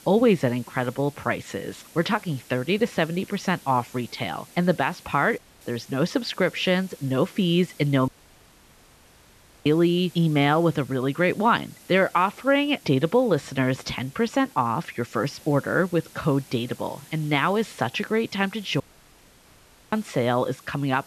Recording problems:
muffled; slightly; fading above 3 kHz
hiss; faint; throughout; 25 dB below the speech
audio cutting out; at 5.5 s, at 8 s for 1.5 s and at 19 s for 1 s

